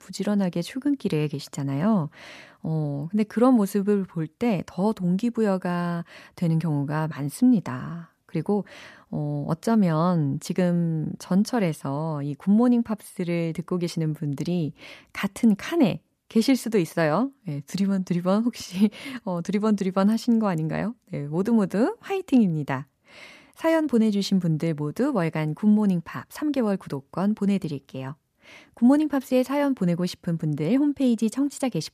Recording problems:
none

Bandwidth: 14.5 kHz